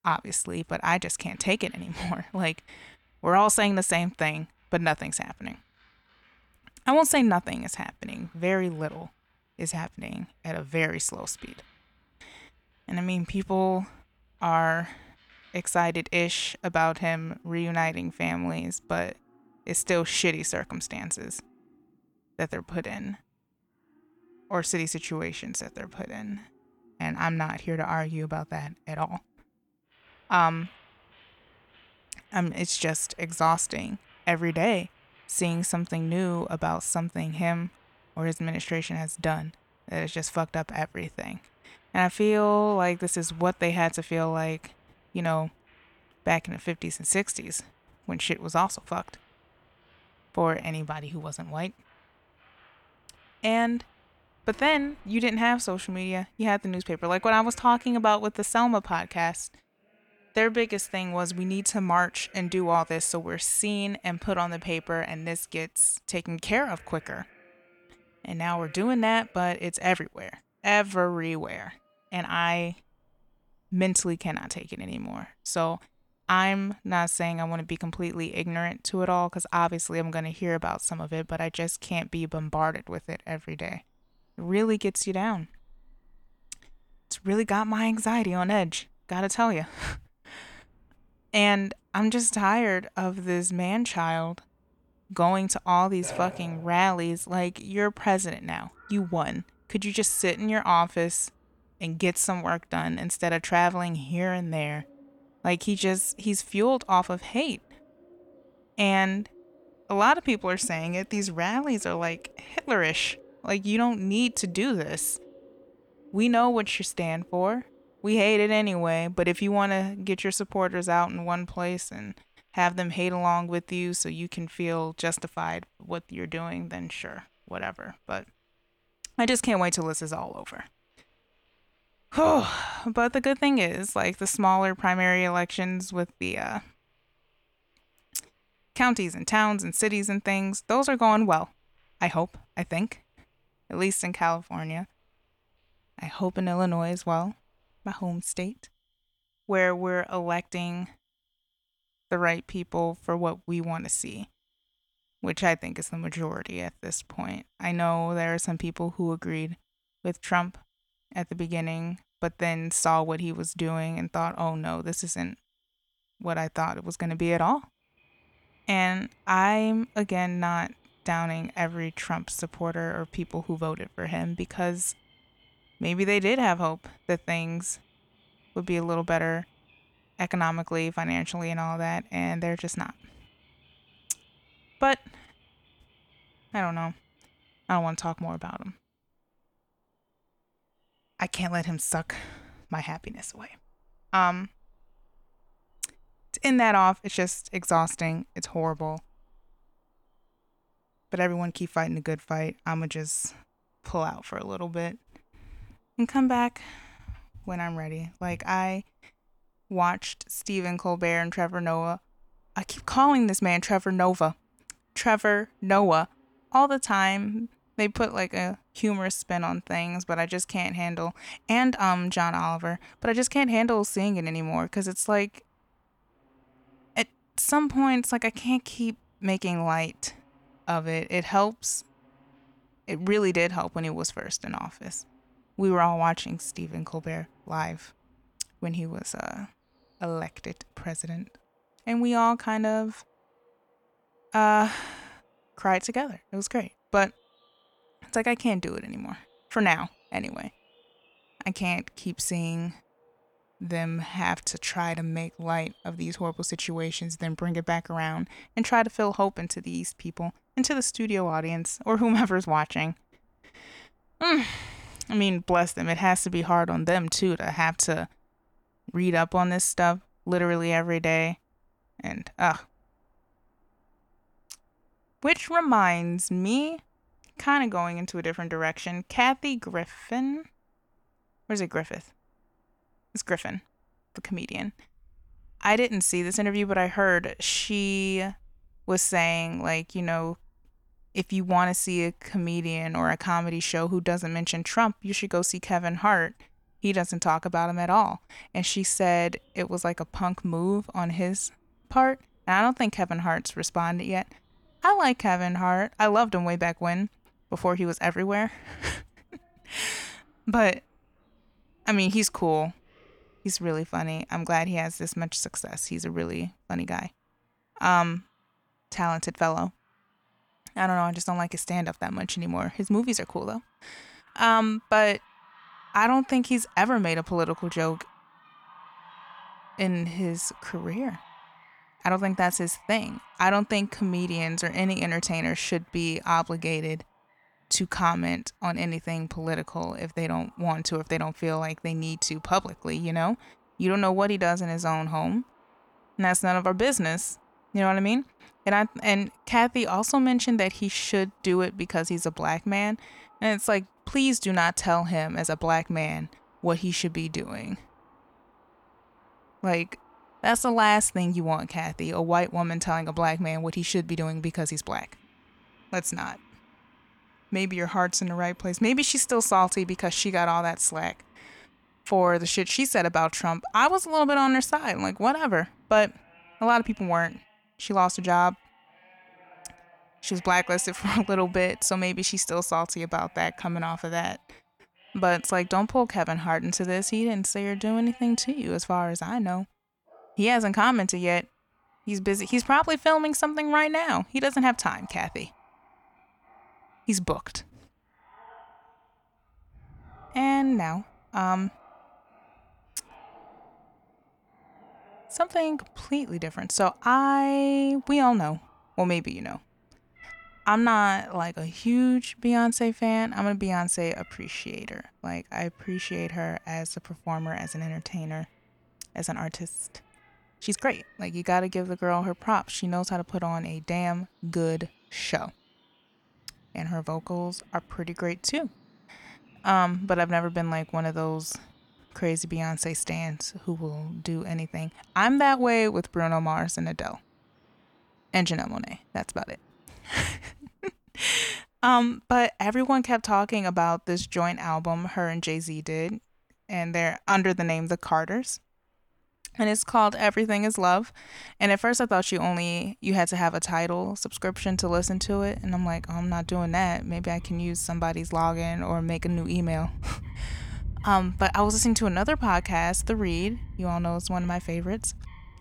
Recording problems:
animal sounds; faint; throughout; 25 dB below the speech
uneven, jittery; strongly; from 50 s to 7:30

